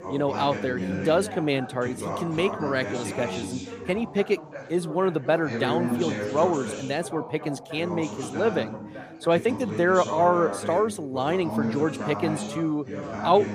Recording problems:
background chatter; loud; throughout; 3 voices, 7 dB below the speech

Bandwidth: 15 kHz